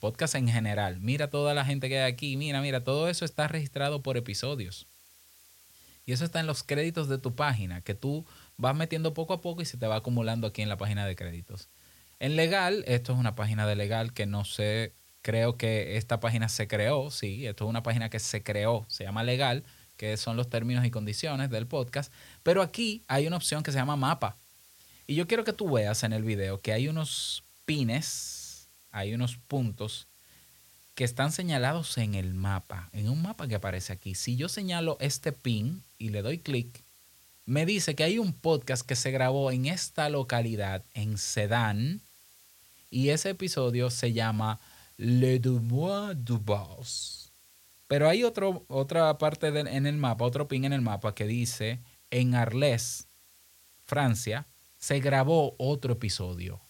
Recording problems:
hiss; faint; throughout; 25 dB below the speech

